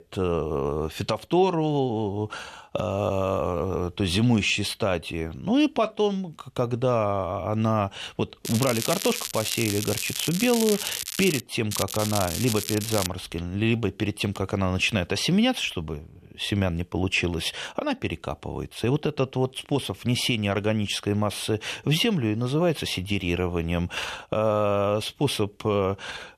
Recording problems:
crackling; loud; from 8.5 to 11 s and from 12 to 13 s; 4 dB below the speech

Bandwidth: 13.5 kHz